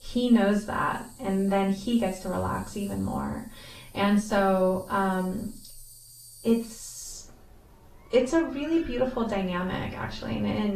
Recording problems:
off-mic speech; far
room echo; slight; dies away in 0.3 s
garbled, watery; slightly; nothing above 14 kHz
animal sounds; faint; throughout; 20 dB below the speech
abrupt cut into speech; at the end

